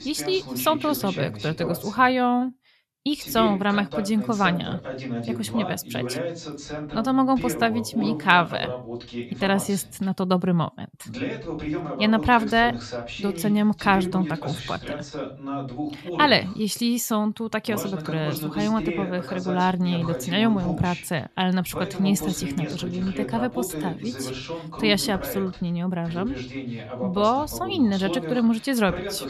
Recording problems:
voice in the background; loud; throughout; 9 dB below the speech

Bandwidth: 13.5 kHz